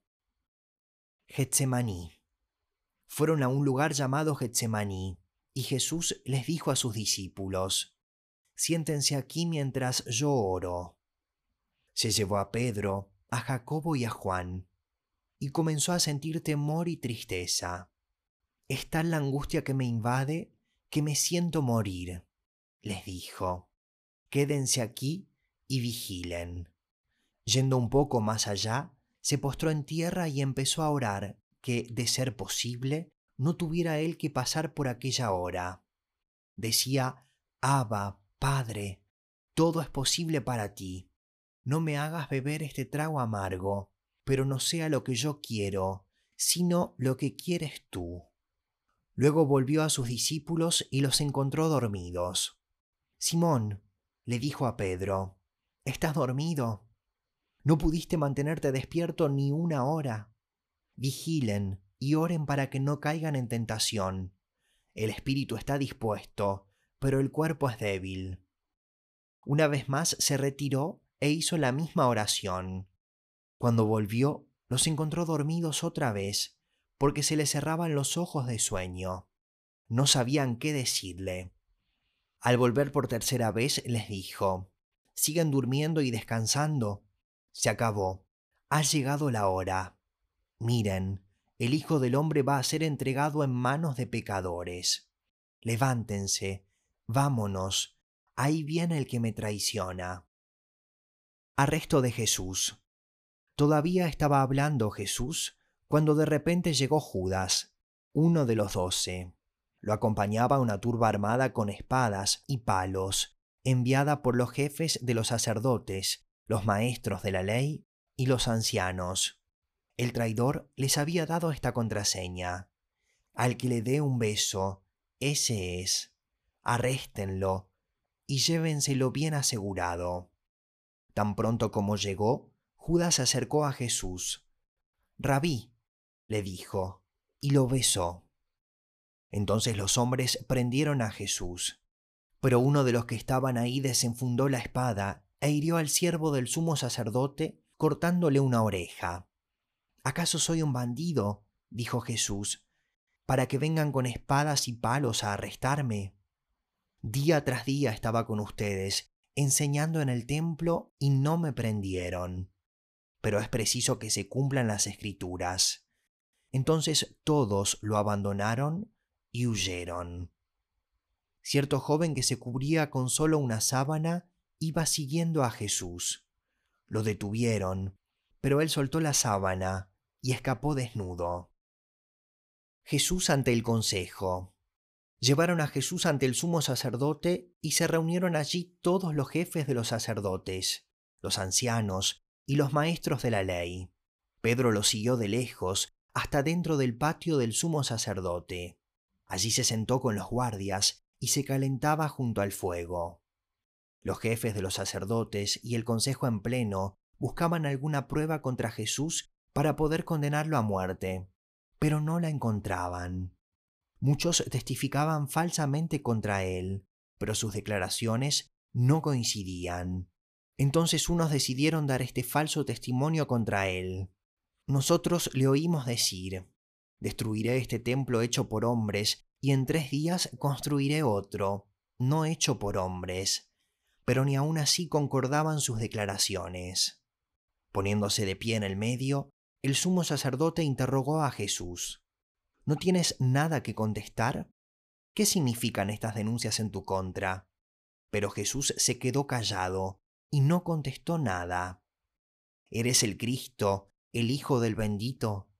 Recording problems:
none

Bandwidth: 14.5 kHz